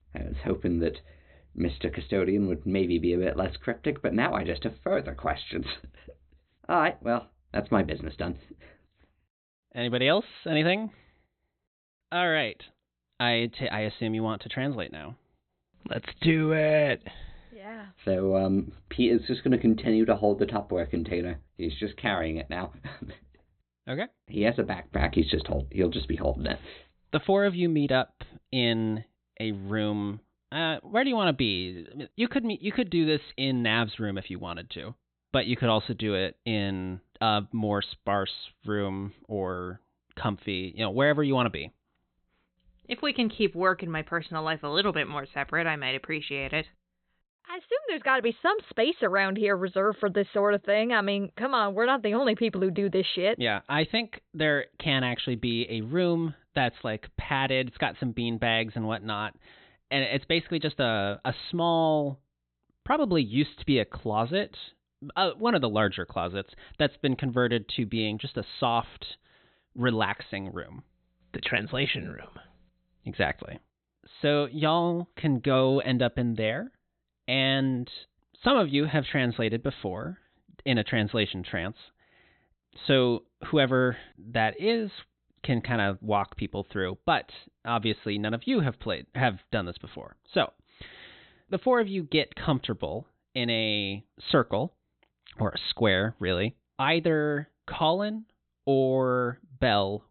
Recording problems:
high frequencies cut off; severe; nothing above 4 kHz

